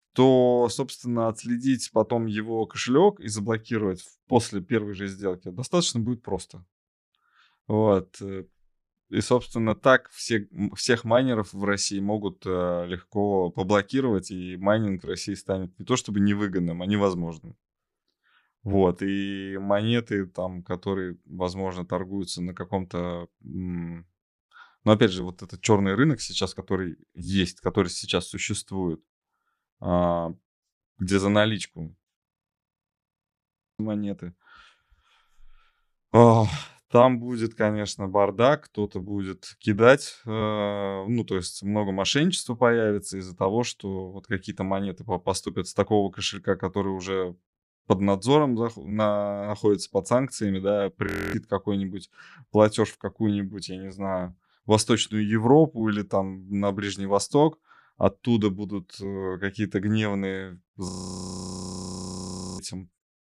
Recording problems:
audio freezing; at 32 s for 1.5 s, at 51 s and at 1:01 for 1.5 s

